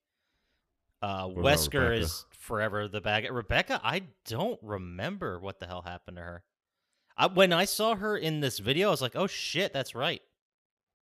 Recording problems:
none

